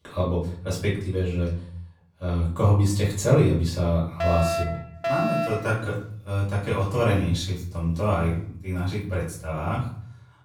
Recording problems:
off-mic speech; far
room echo; noticeable; dies away in 0.5 s
alarm; loud; from 4 to 5.5 s; peak level with the speech

